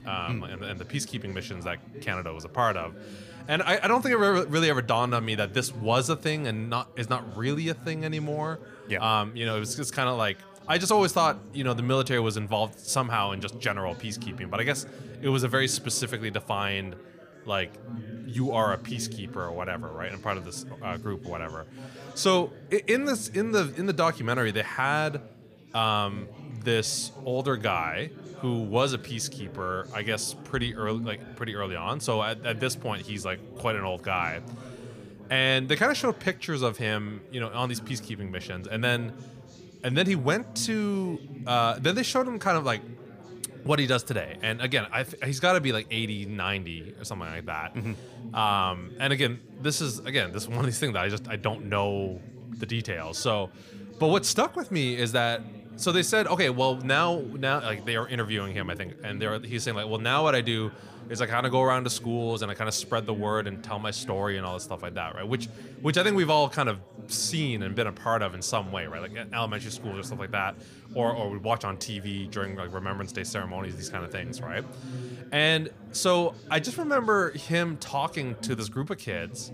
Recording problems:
background chatter; noticeable; throughout; 4 voices, 15 dB below the speech

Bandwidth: 15 kHz